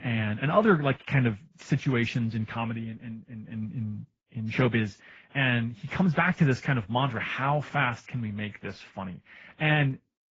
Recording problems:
garbled, watery; badly; nothing above 7.5 kHz
muffled; very slightly; fading above 2 kHz

